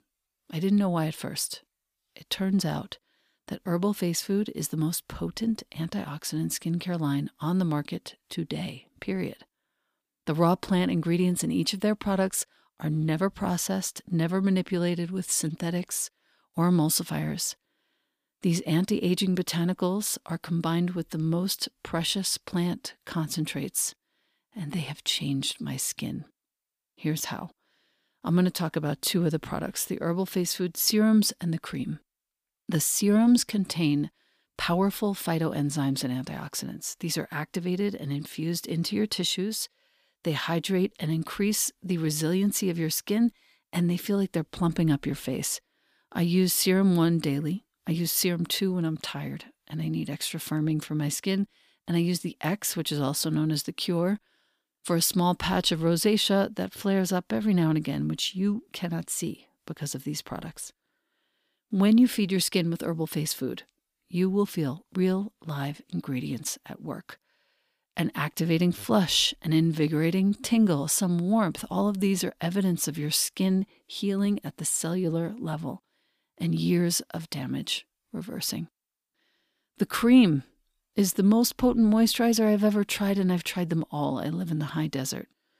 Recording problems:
none

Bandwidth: 15 kHz